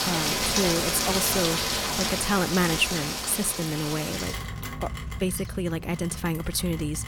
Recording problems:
rain or running water; very loud; throughout; as loud as the speech

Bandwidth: 18 kHz